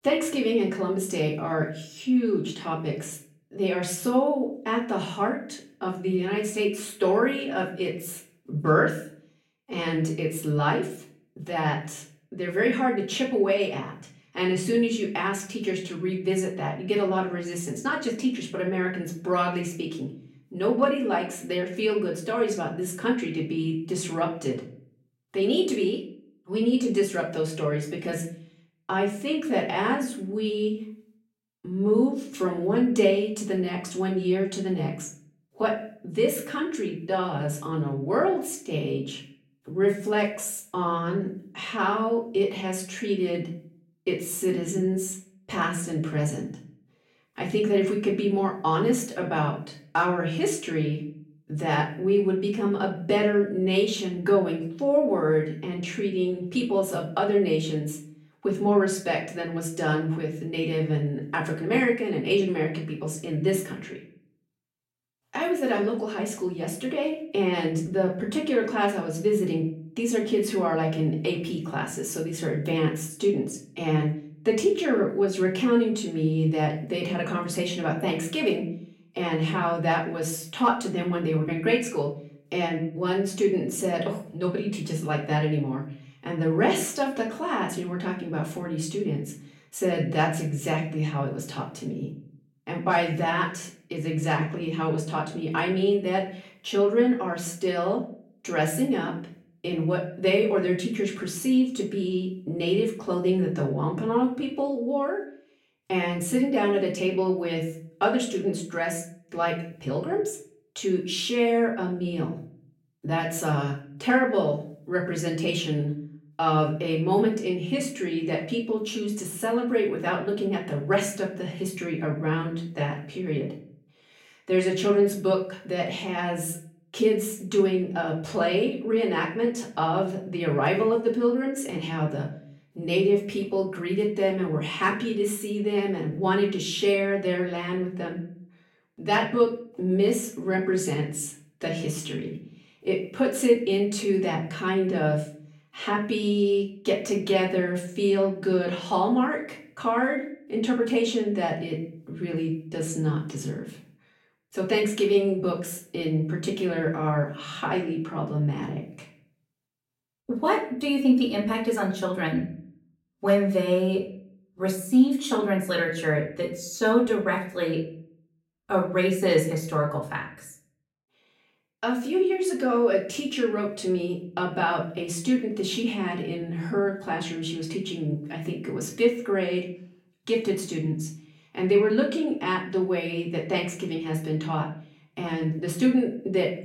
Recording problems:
off-mic speech; far
room echo; slight; dies away in 0.4 s

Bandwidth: 16 kHz